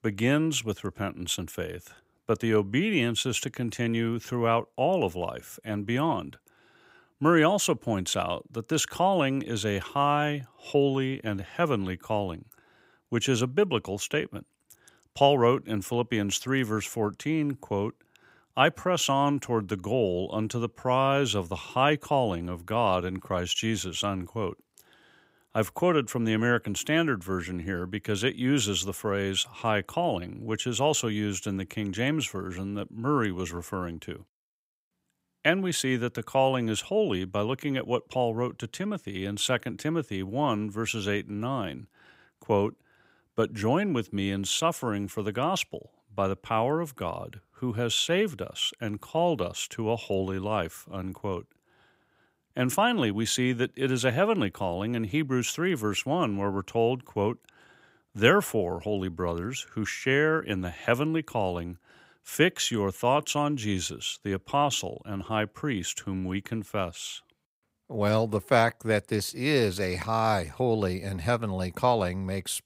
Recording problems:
none

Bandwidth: 15.5 kHz